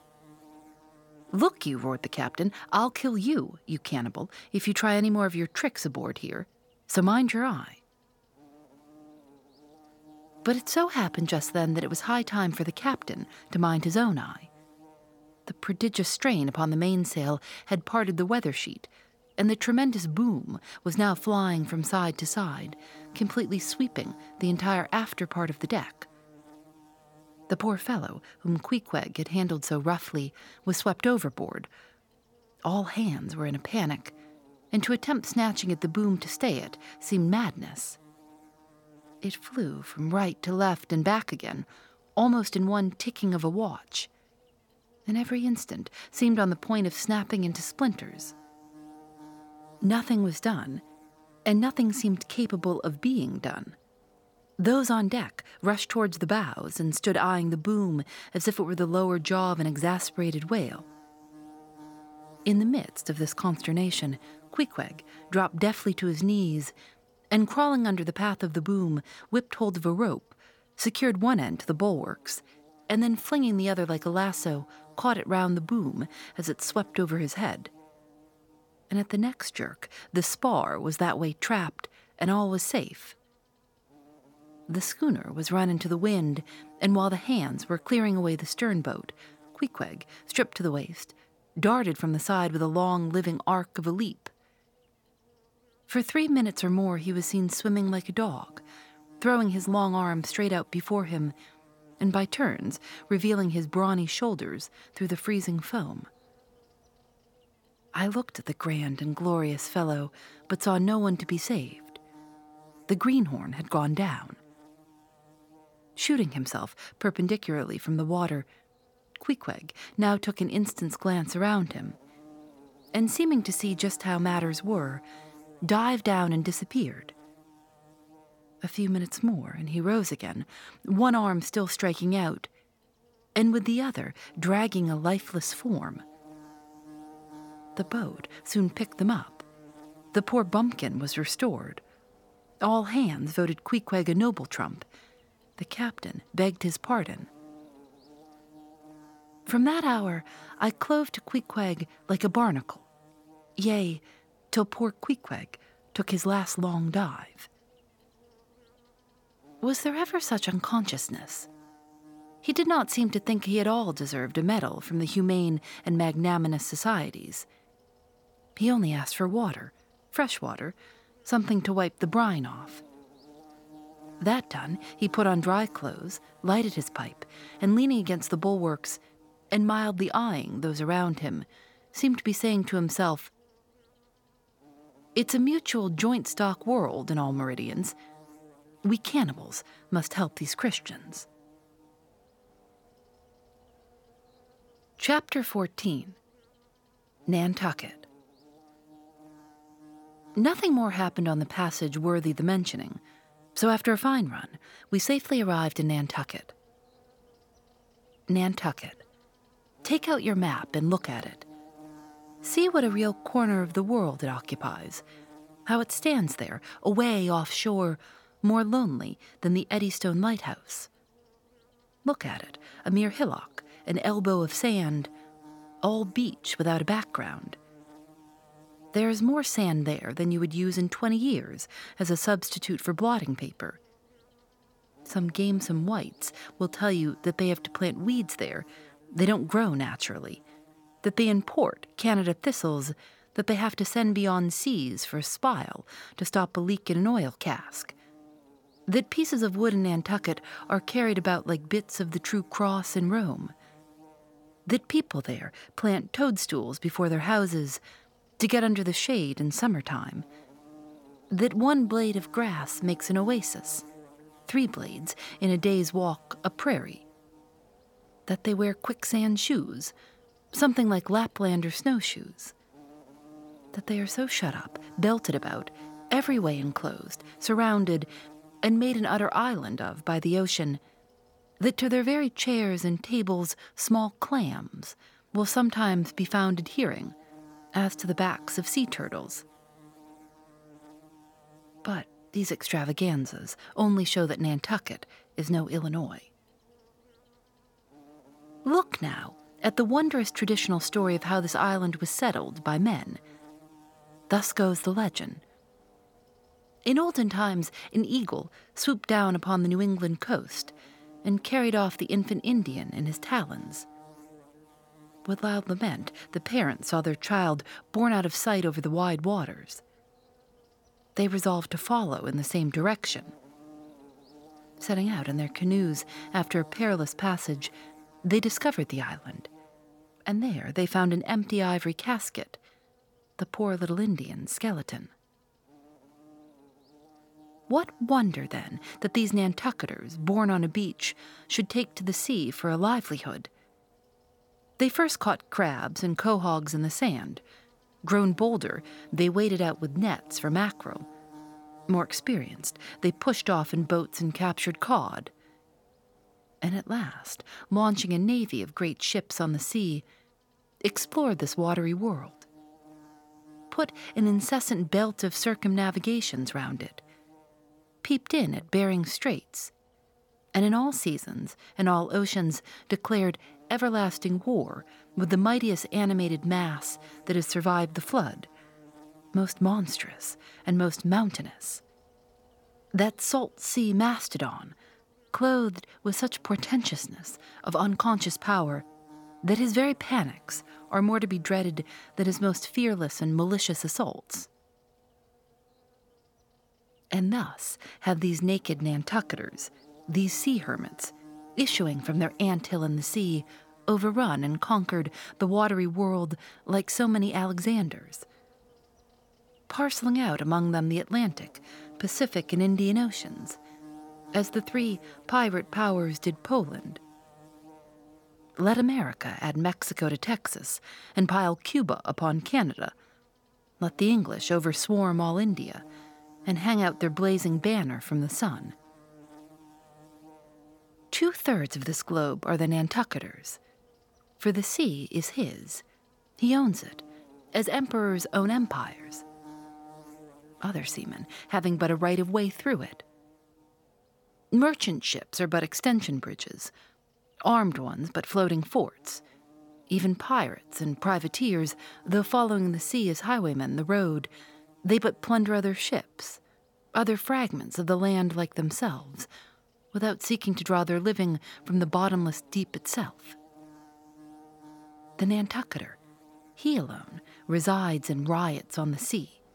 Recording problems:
electrical hum; faint; throughout; 50 Hz, 25 dB below the speech

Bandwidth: 18 kHz